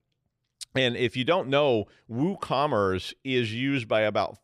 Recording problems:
none

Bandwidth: 15 kHz